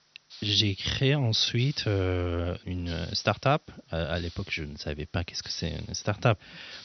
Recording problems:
high frequencies cut off; noticeable; nothing above 6 kHz
hiss; noticeable; throughout; 20 dB below the speech

